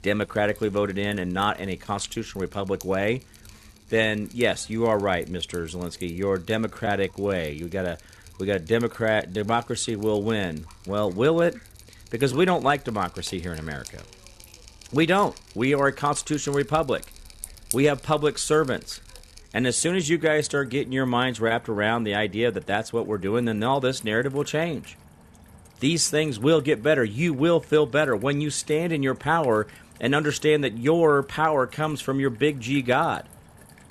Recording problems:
rain or running water; faint; throughout; 20 dB below the speech

